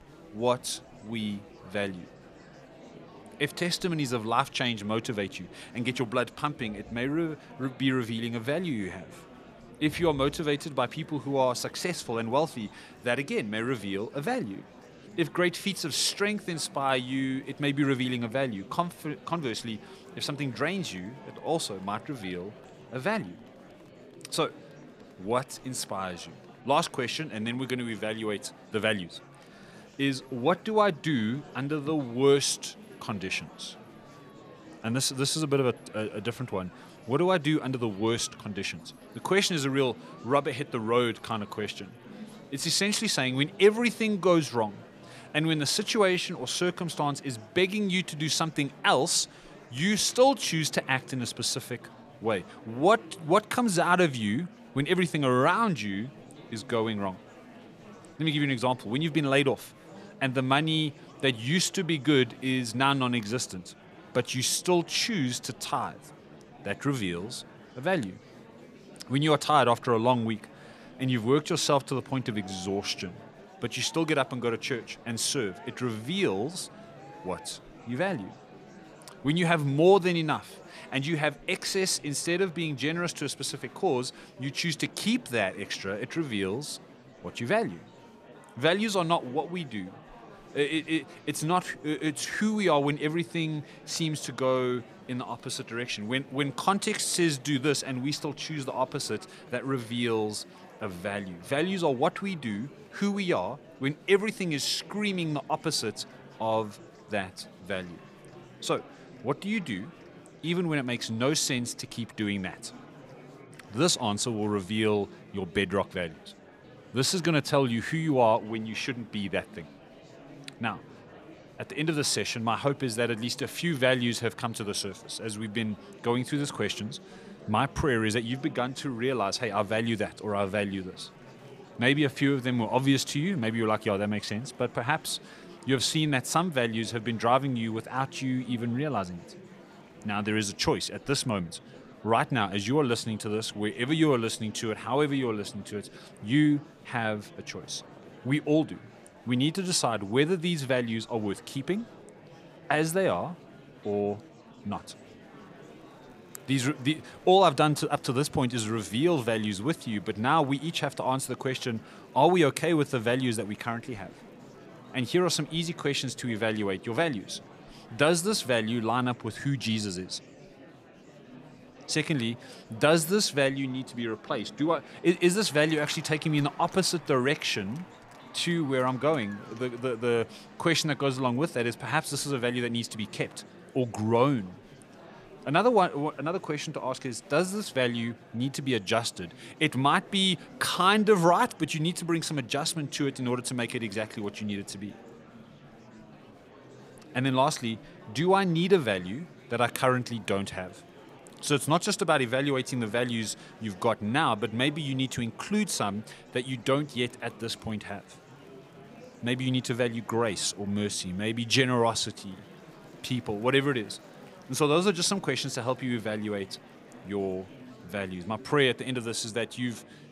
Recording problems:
murmuring crowd; faint; throughout; 20 dB below the speech

